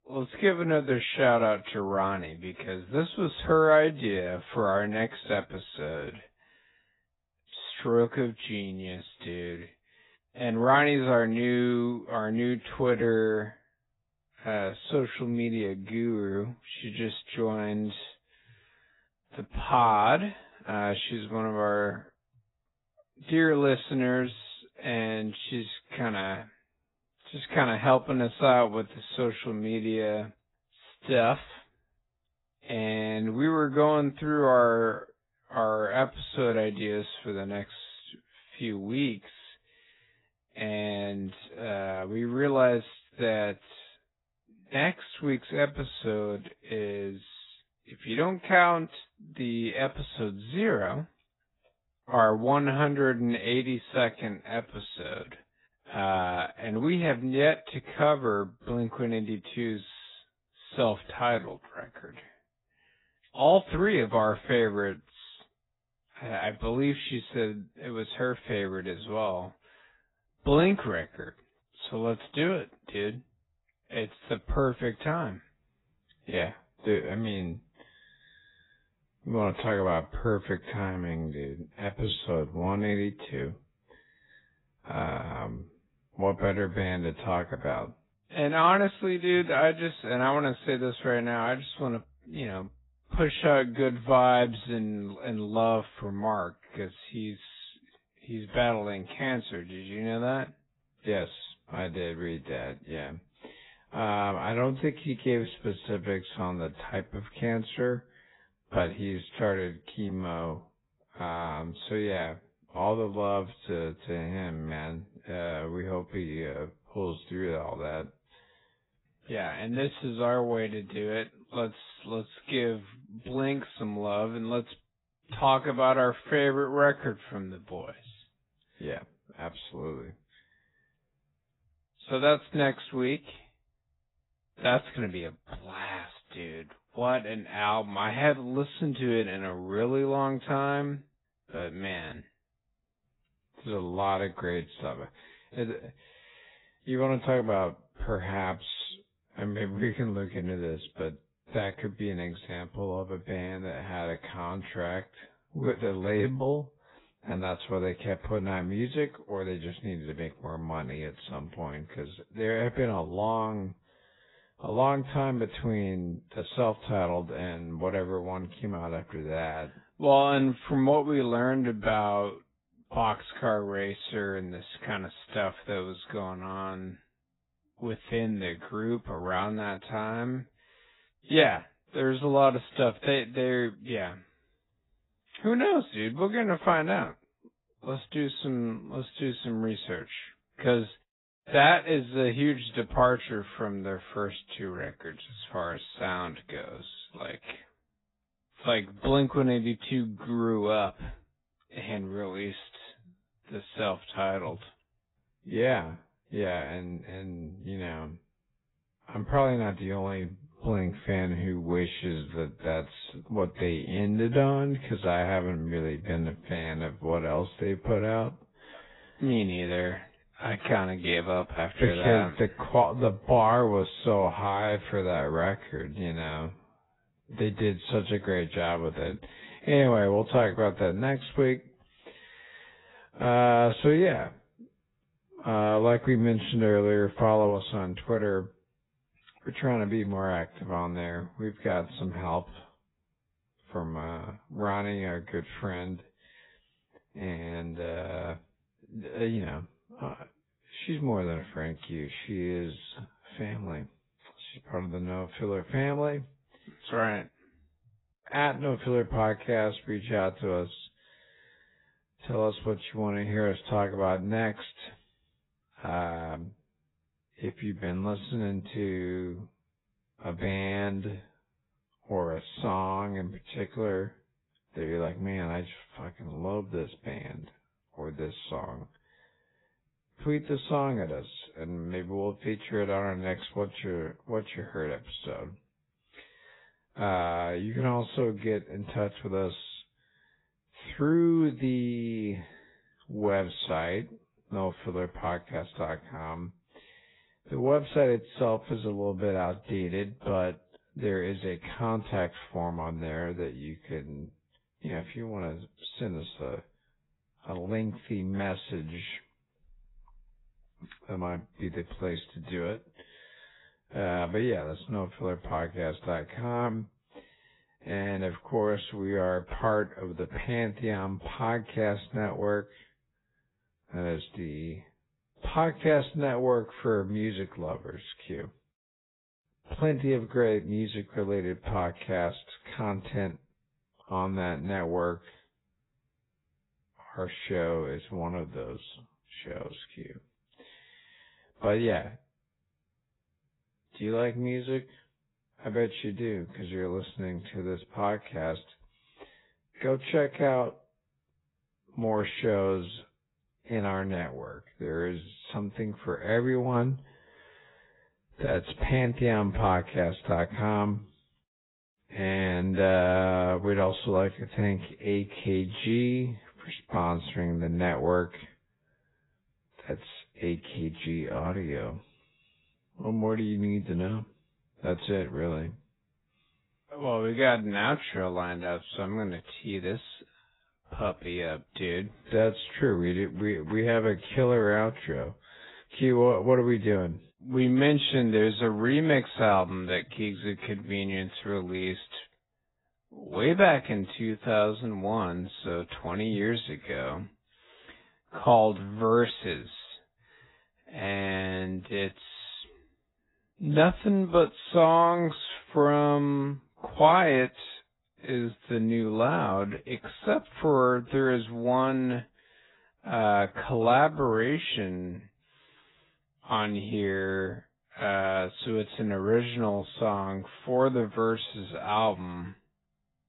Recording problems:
garbled, watery; badly; nothing above 4 kHz
wrong speed, natural pitch; too slow; 0.6 times normal speed

